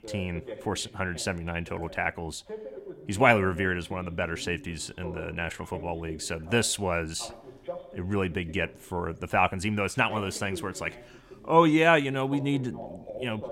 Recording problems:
voice in the background; noticeable; throughout; 15 dB below the speech

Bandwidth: 16 kHz